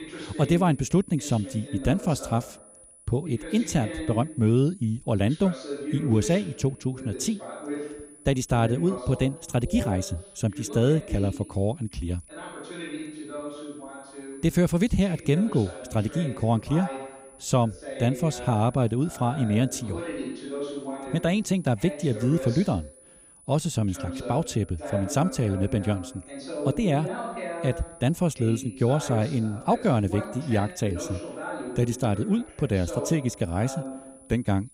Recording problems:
voice in the background; noticeable; throughout; 10 dB below the speech
high-pitched whine; faint; throughout; 10 kHz, 25 dB below the speech

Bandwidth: 15.5 kHz